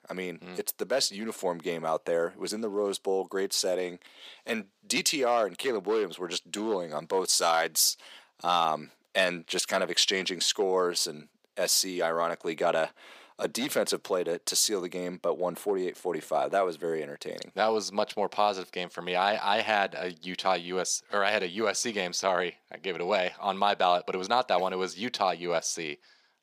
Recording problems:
thin; somewhat; fading below 450 Hz

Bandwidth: 15 kHz